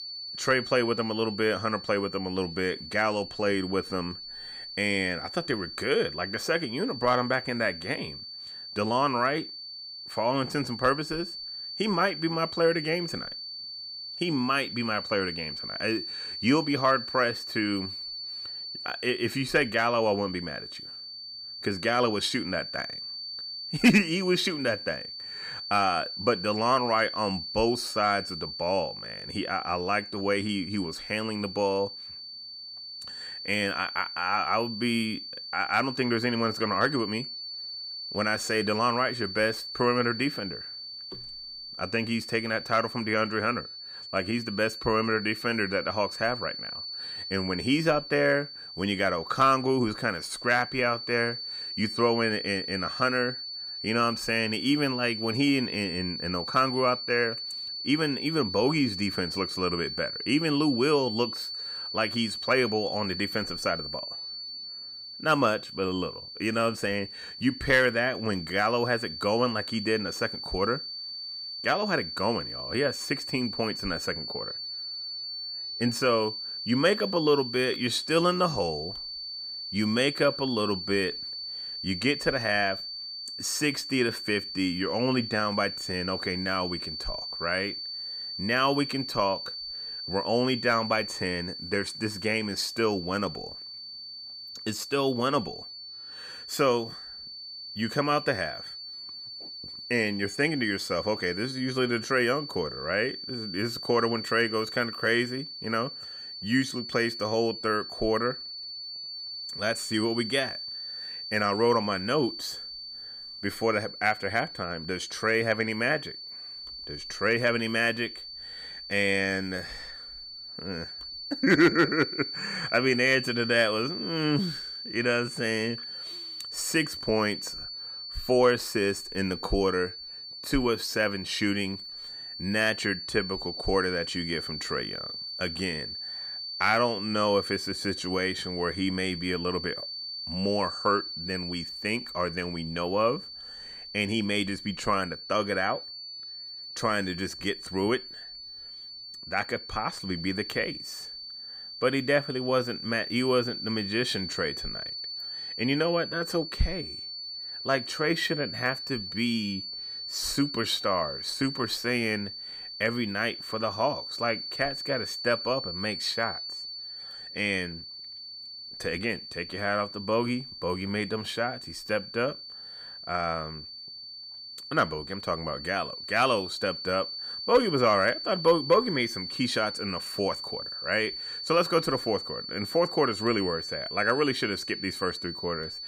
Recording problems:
high-pitched whine; loud; throughout; 4.5 kHz, 7 dB below the speech

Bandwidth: 15 kHz